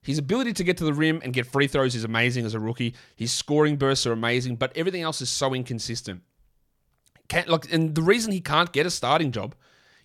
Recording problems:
none

